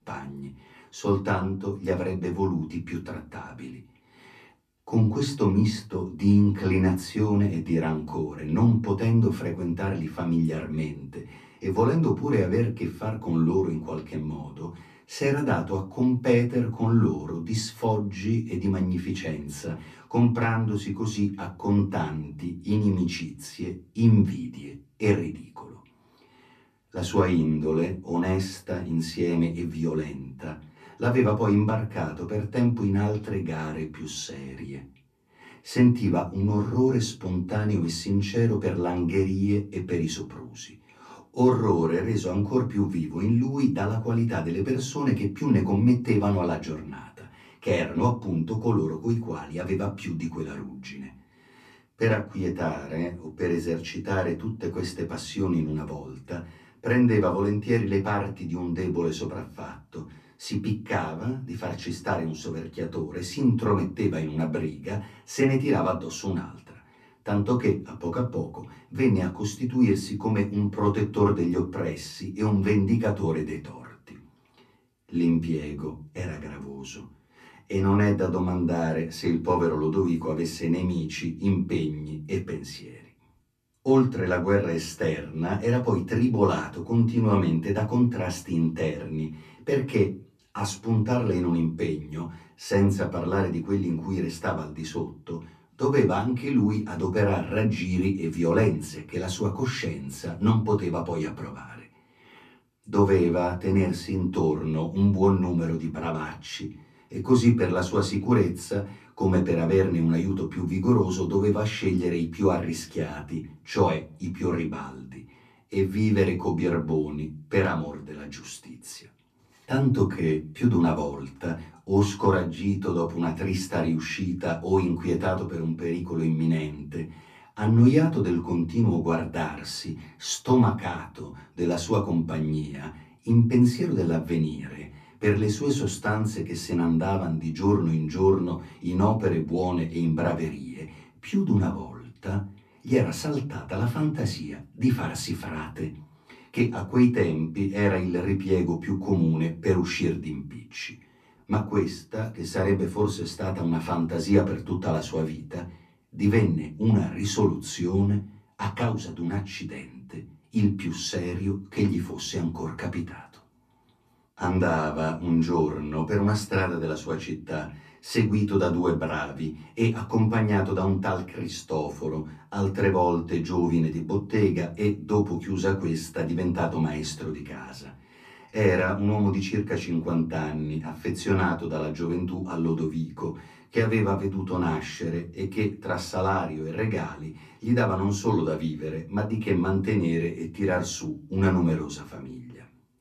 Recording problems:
off-mic speech; far
room echo; very slight; dies away in 0.3 s

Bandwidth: 14.5 kHz